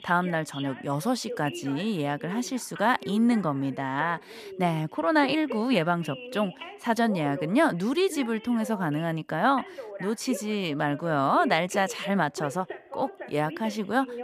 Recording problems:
voice in the background; noticeable; throughout; 15 dB below the speech

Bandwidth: 14.5 kHz